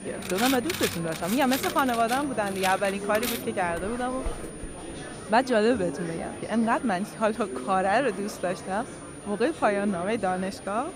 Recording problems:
household noises; loud; until 5 s; 6 dB below the speech
high-pitched whine; noticeable; throughout; 9.5 kHz, 20 dB below the speech
murmuring crowd; noticeable; throughout; 10 dB below the speech

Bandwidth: 15.5 kHz